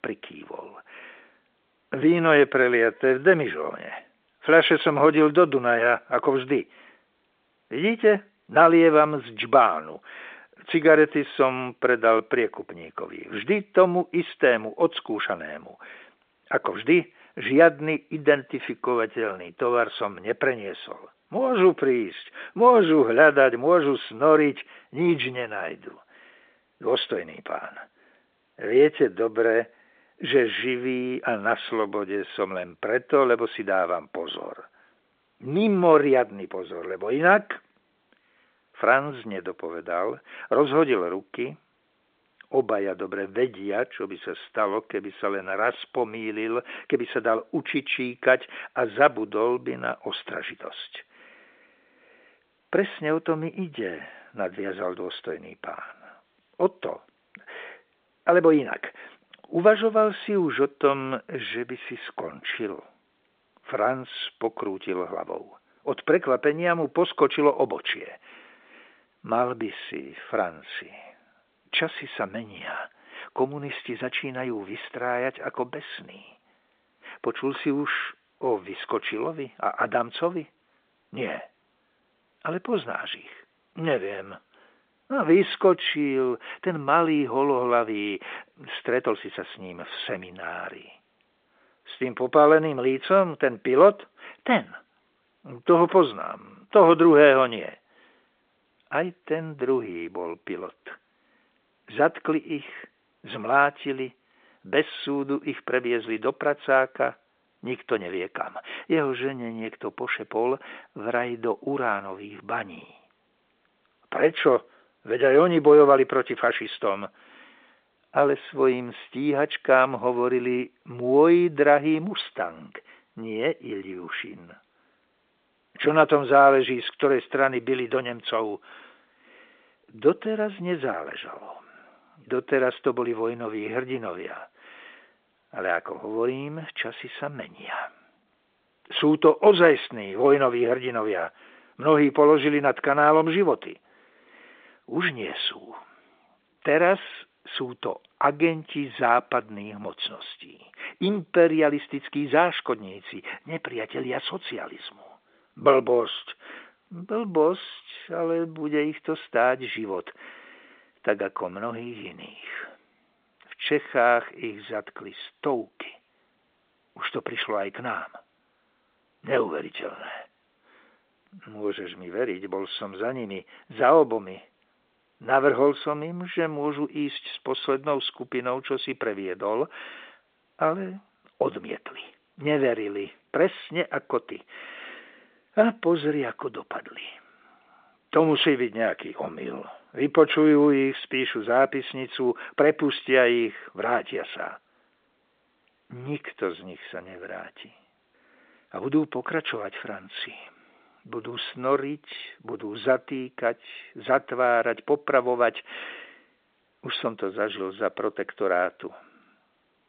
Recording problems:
phone-call audio; nothing above 3.5 kHz

